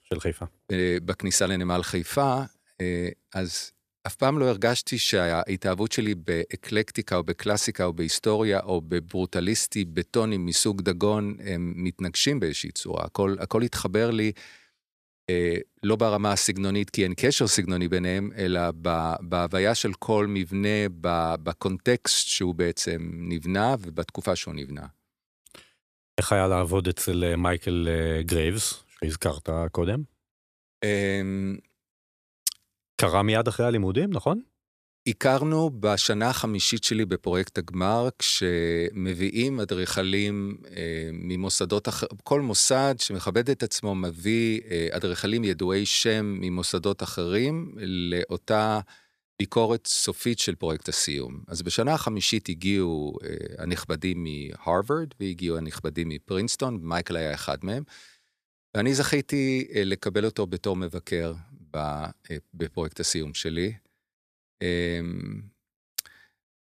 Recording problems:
none

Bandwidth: 14.5 kHz